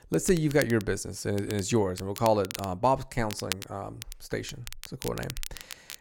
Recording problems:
crackle, like an old record; noticeable; 10 dB below the speech

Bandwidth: 16.5 kHz